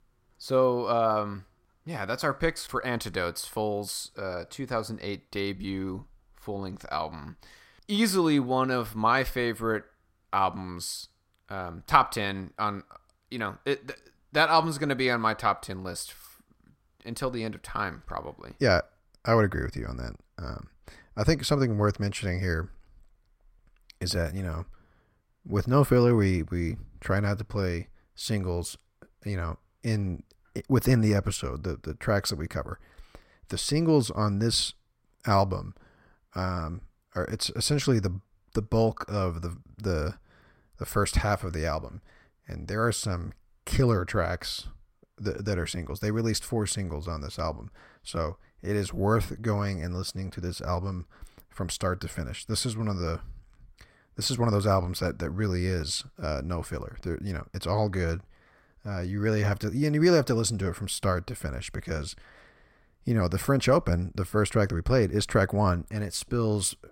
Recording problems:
none

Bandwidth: 16 kHz